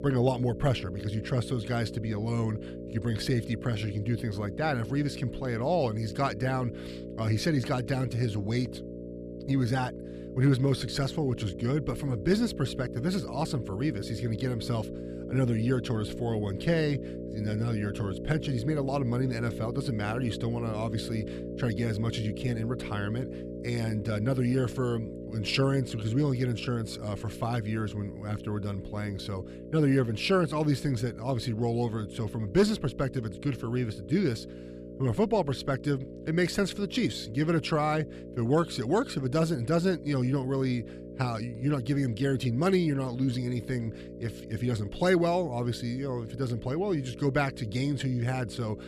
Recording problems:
electrical hum; noticeable; throughout; 60 Hz, 10 dB below the speech

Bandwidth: 14.5 kHz